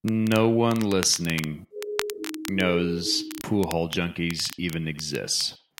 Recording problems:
echo of what is said; faint; throughout; 80 ms later, 20 dB below the speech
crackle, like an old record; noticeable; 15 dB below the speech
siren; noticeable; from 1.5 to 3.5 s; peak 7 dB below the speech

